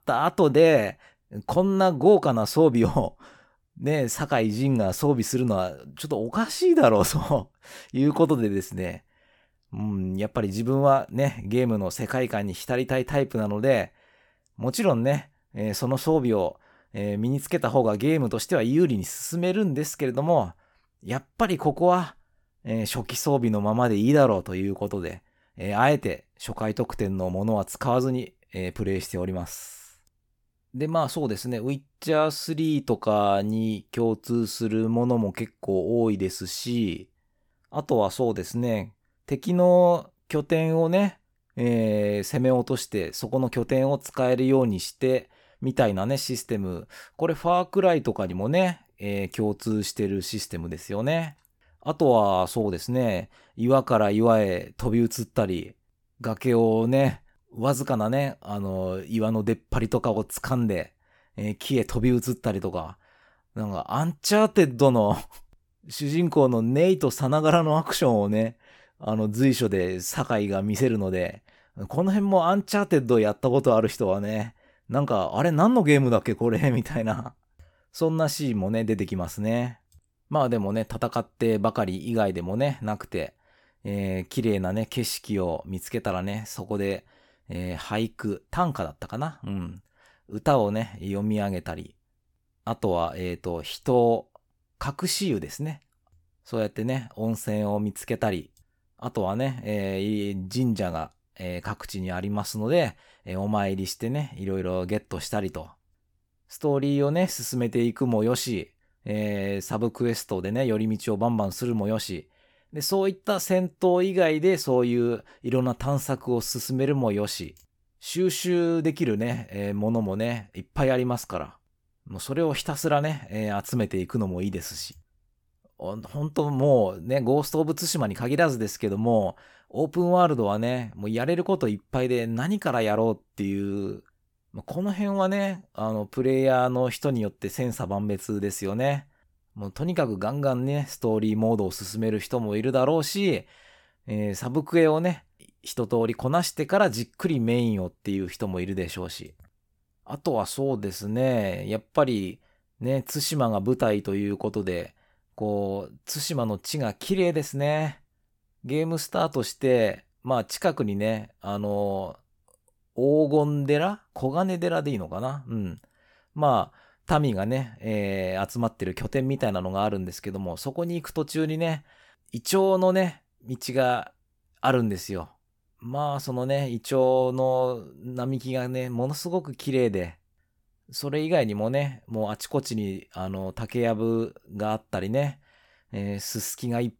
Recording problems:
none

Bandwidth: 18 kHz